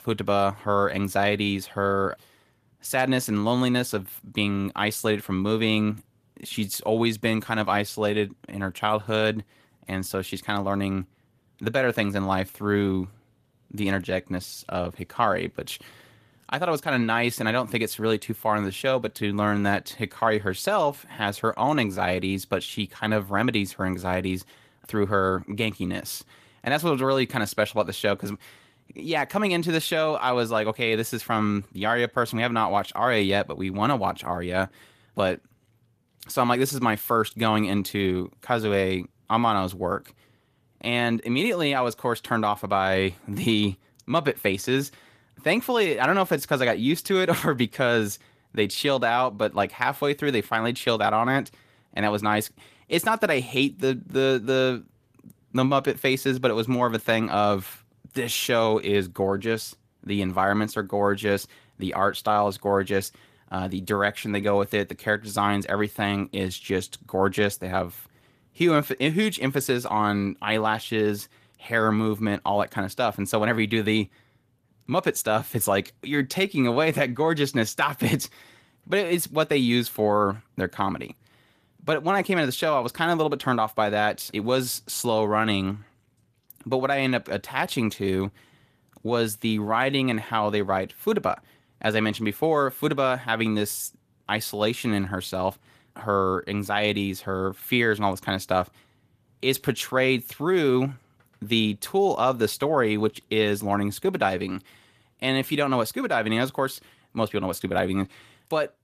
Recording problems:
garbled, watery; slightly; nothing above 14.5 kHz

